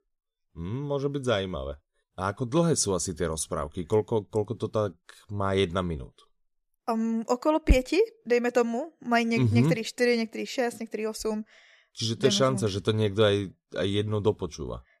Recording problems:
none

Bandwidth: 14.5 kHz